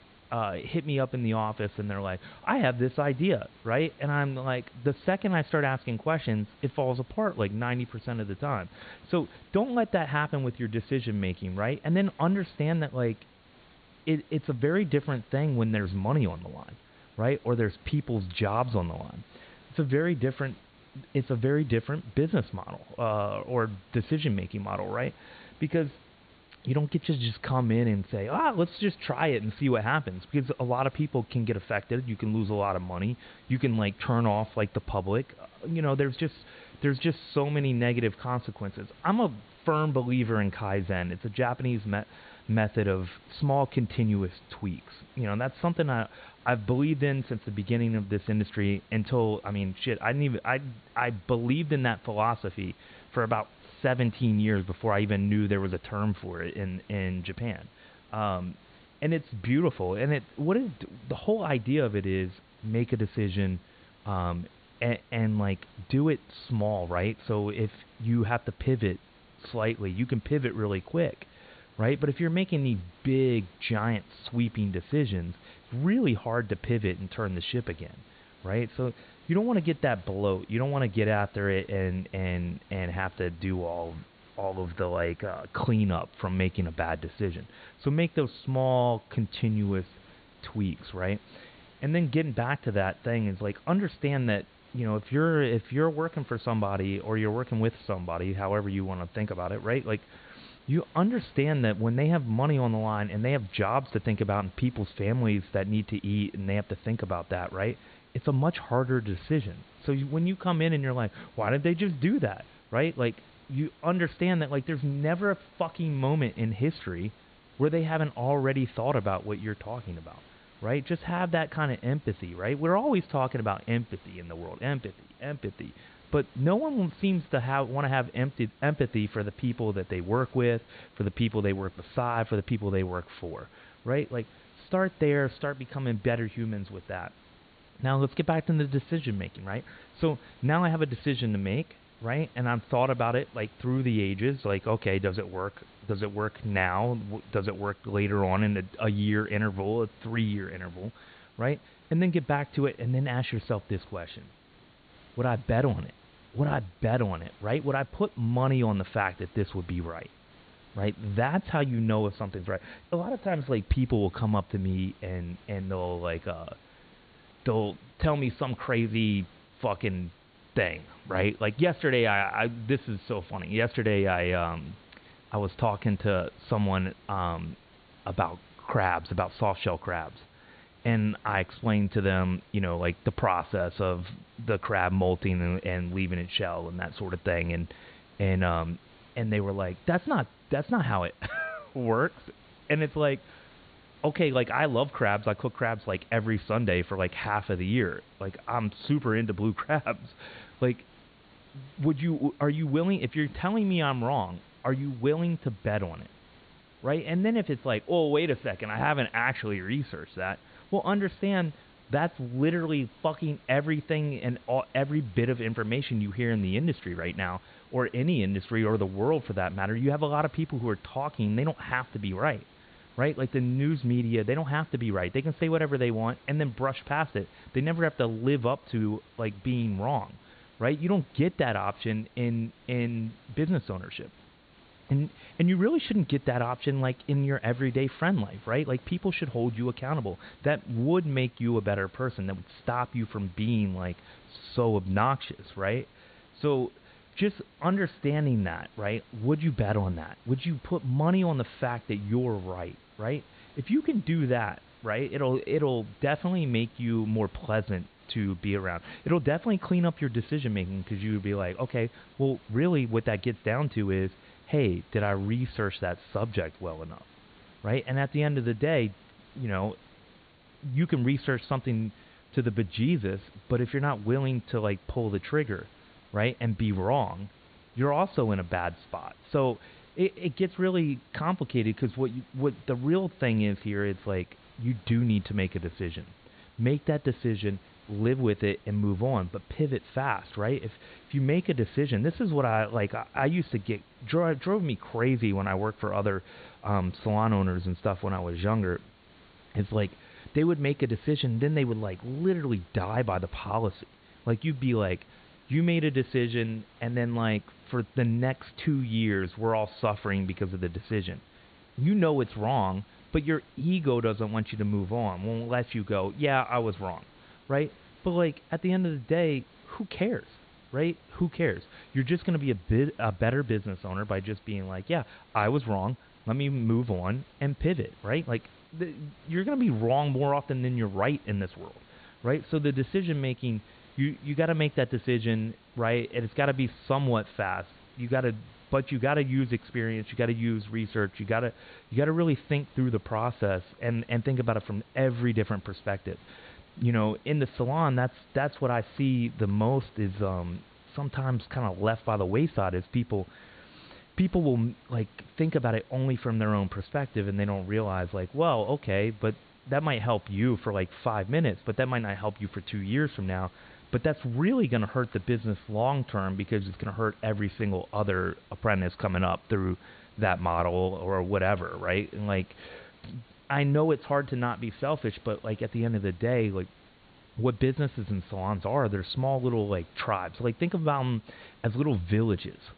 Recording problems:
high frequencies cut off; severe; nothing above 4.5 kHz
hiss; faint; throughout; 25 dB below the speech

